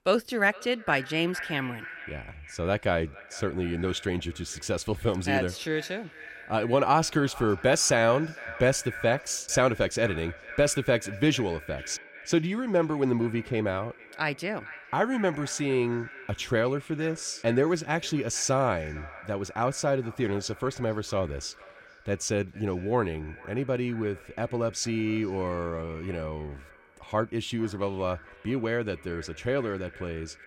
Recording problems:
echo of what is said; noticeable; throughout; 450 ms later, 15 dB below the speech

